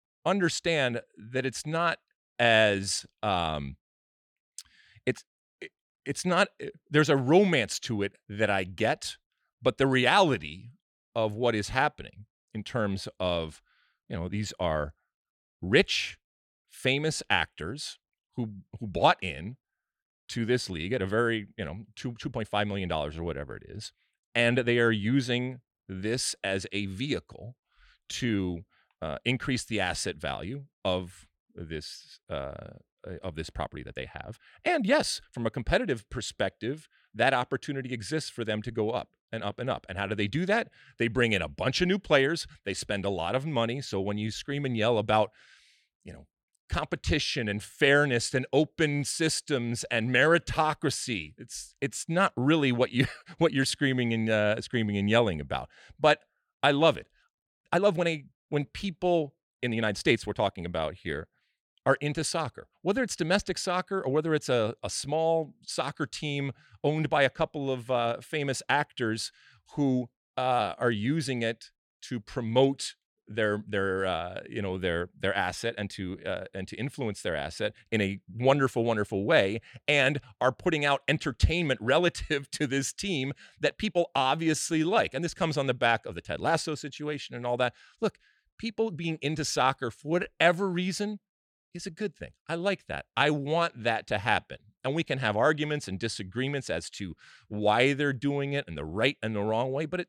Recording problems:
uneven, jittery; strongly; from 2.5 s to 1:33

